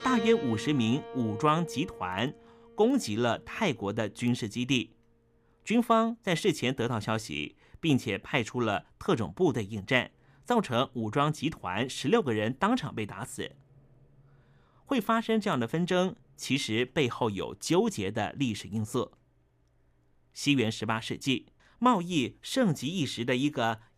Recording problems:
background music; noticeable; throughout; 15 dB below the speech

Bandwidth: 15 kHz